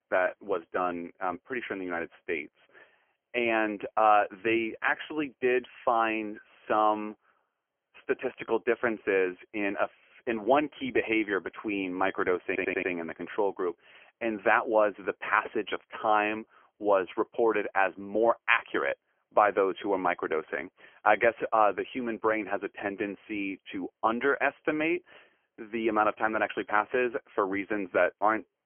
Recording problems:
phone-call audio; poor line; nothing above 3 kHz
audio stuttering; at 12 s

